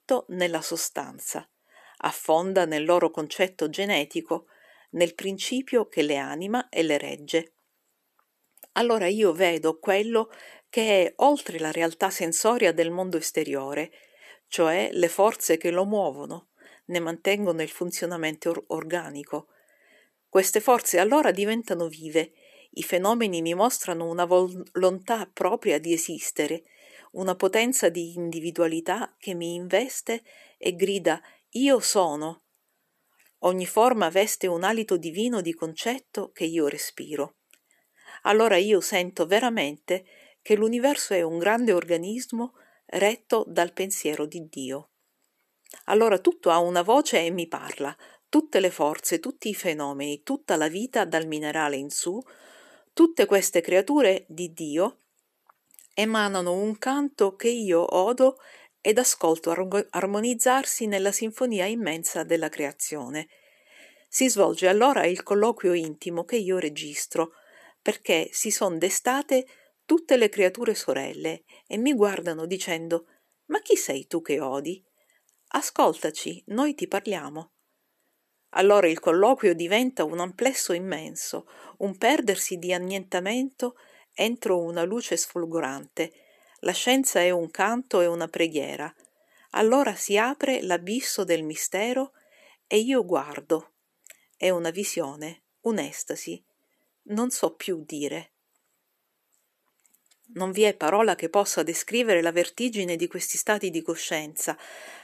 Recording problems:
none

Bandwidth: 14 kHz